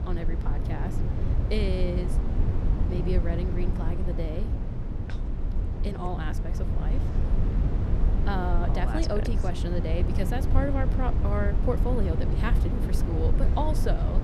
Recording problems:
low rumble; loud; throughout; 5 dB below the speech

